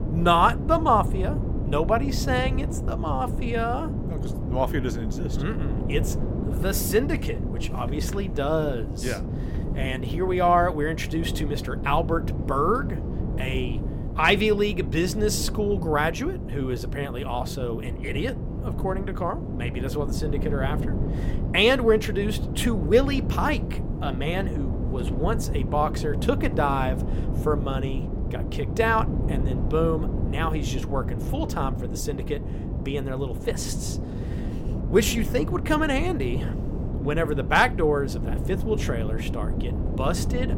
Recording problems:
wind noise on the microphone; occasional gusts; 10 dB below the speech

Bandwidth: 16.5 kHz